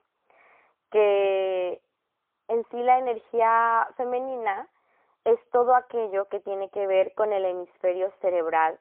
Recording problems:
phone-call audio; poor line; nothing above 3 kHz

